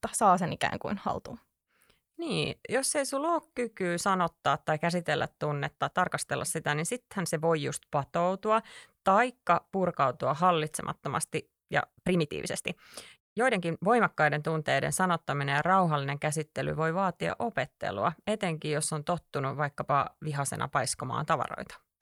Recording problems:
uneven, jittery; strongly; from 0.5 to 21 s

